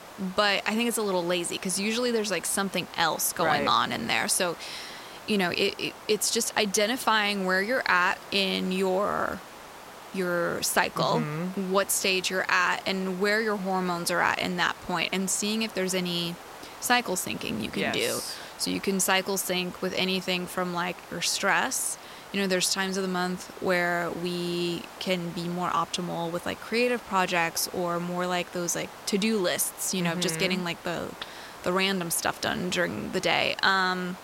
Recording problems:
hiss; noticeable; throughout; 15 dB below the speech

